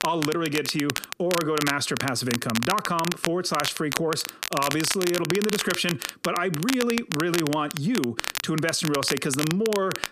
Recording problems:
squashed, flat; heavily
crackle, like an old record; loud; 5 dB below the speech

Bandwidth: 14.5 kHz